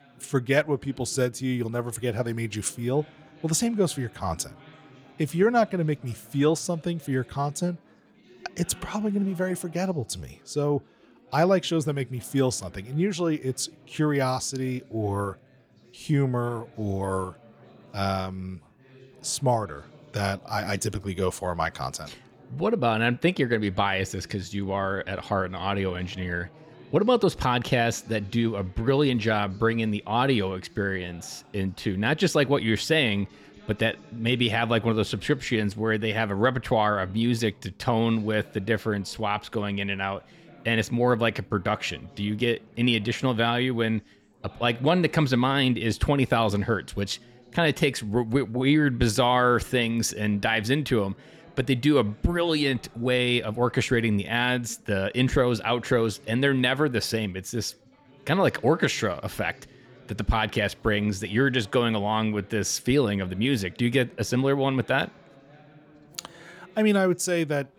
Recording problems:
background chatter; faint; throughout; 4 voices, 25 dB below the speech

